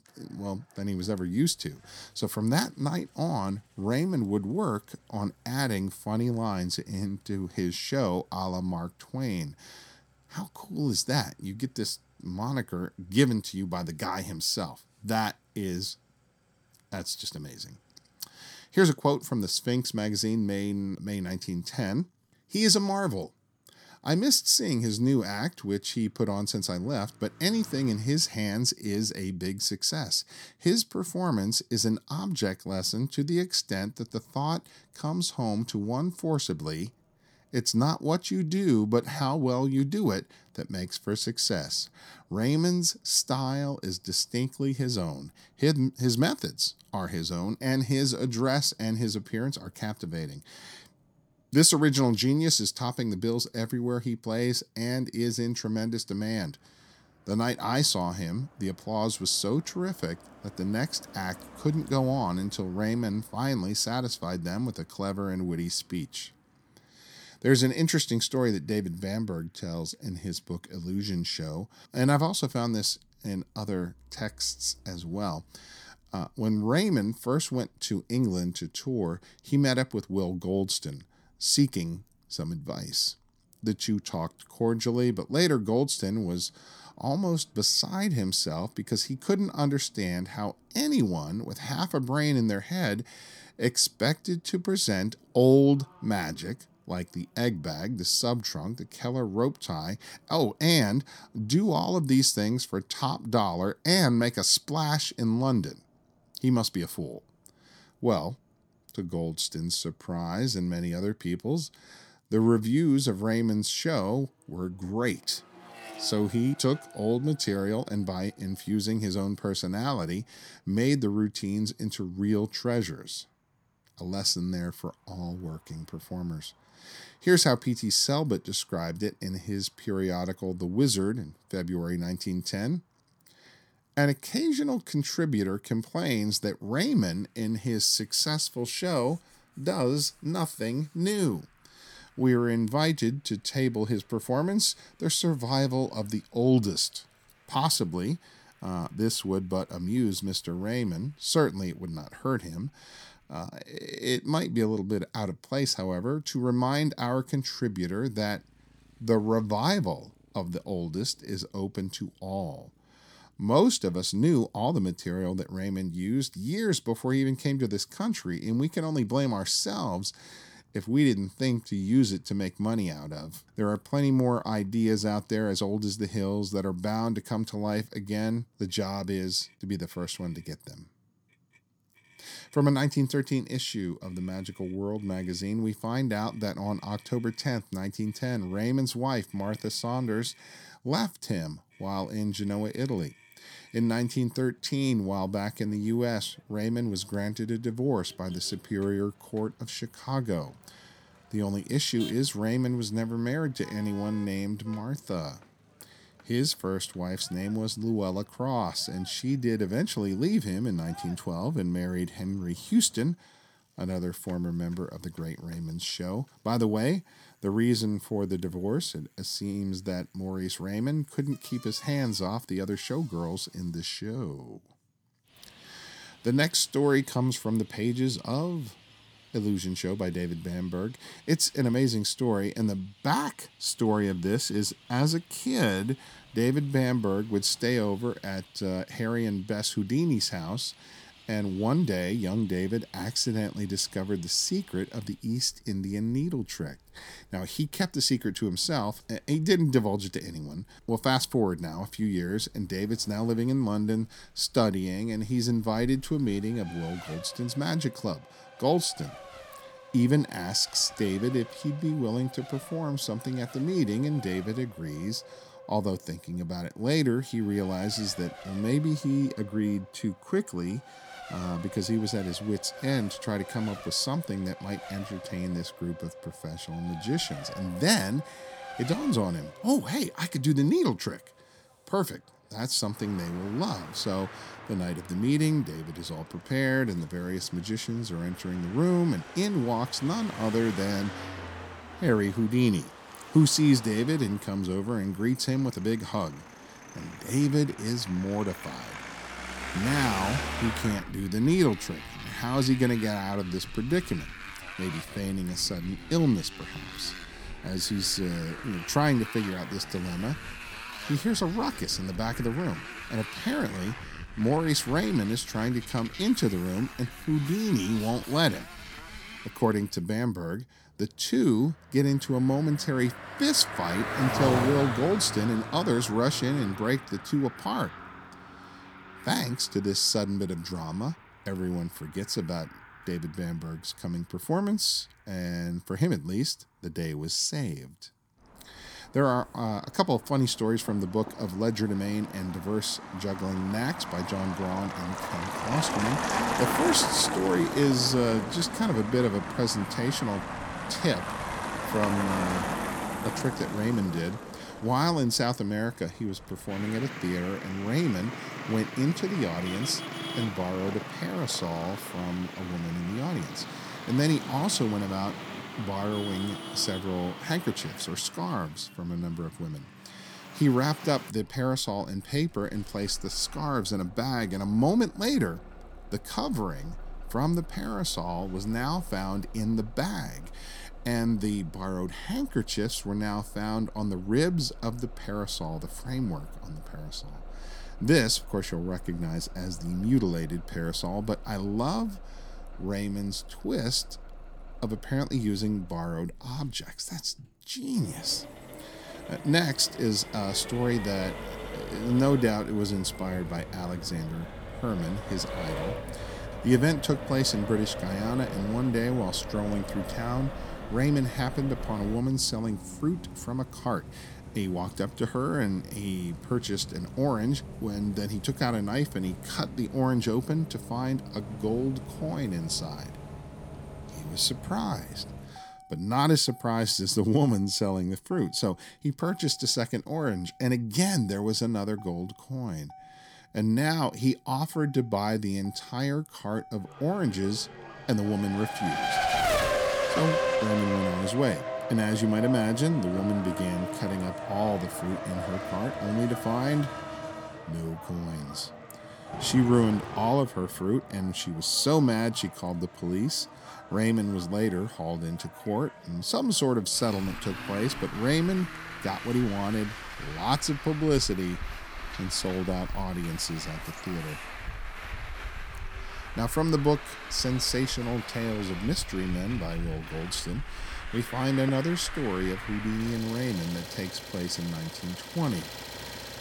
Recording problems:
traffic noise; noticeable; throughout; 10 dB below the speech

